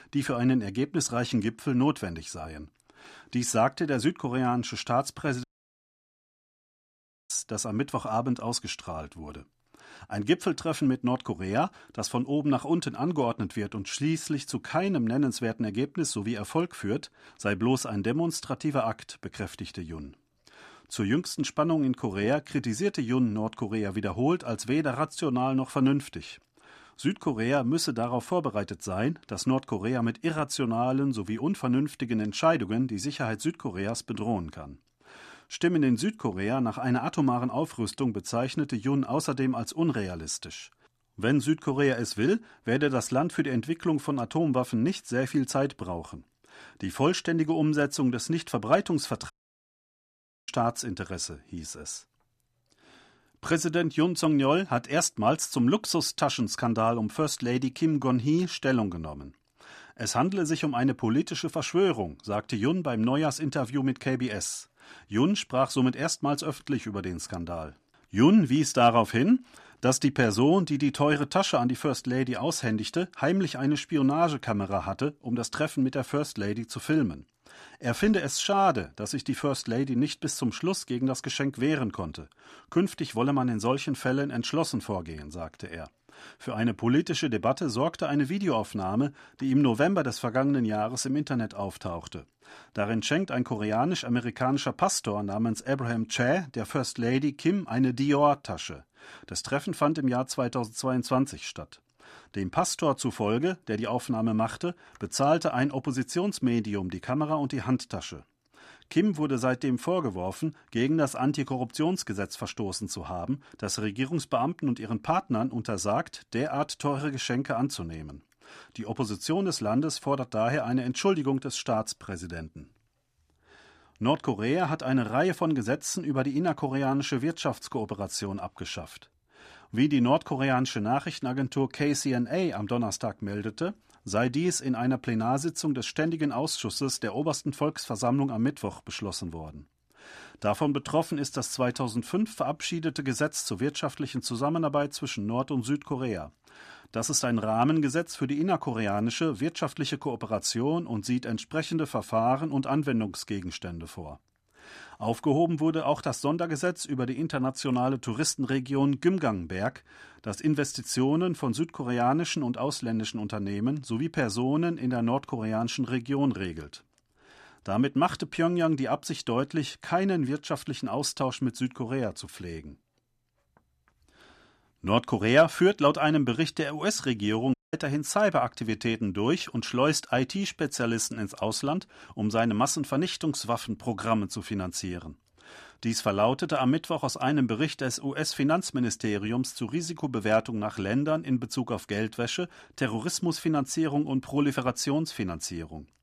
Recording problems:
audio cutting out; at 5.5 s for 2 s, at 49 s for 1 s and at 2:58

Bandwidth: 14.5 kHz